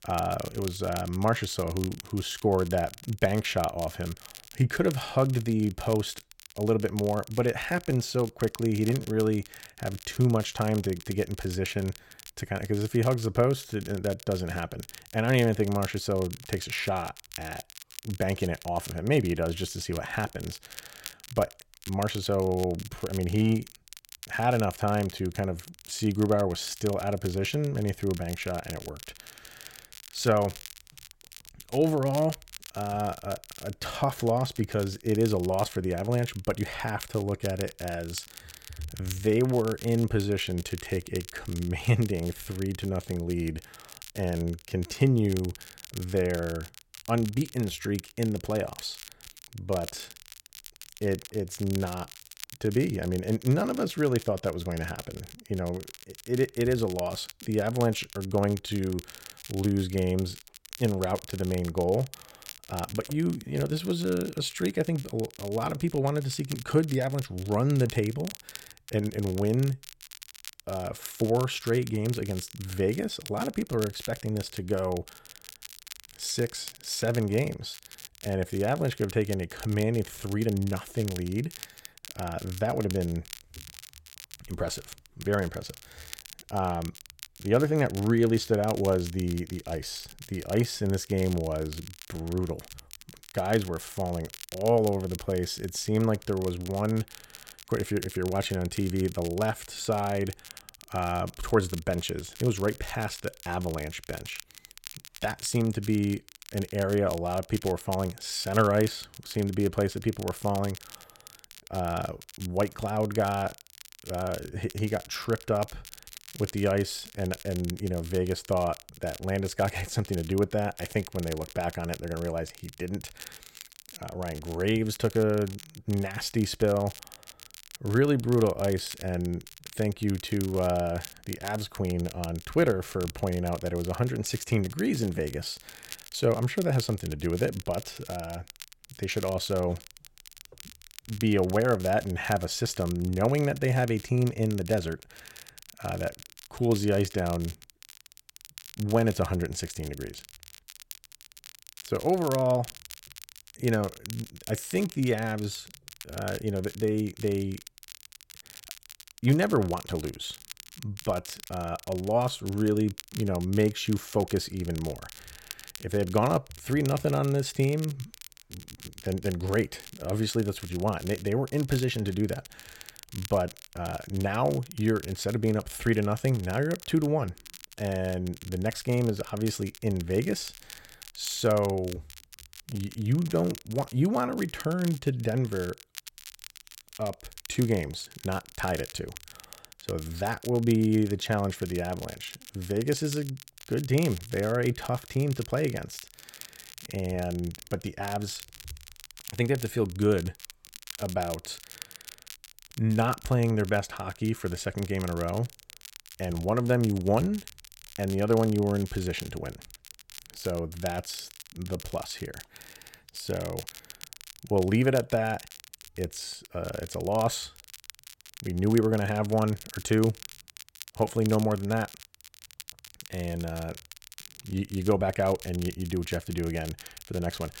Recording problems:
crackle, like an old record; noticeable; 15 dB below the speech

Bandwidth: 16.5 kHz